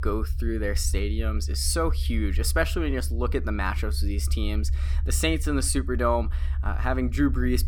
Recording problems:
low rumble; noticeable; throughout; 20 dB below the speech

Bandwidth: 18 kHz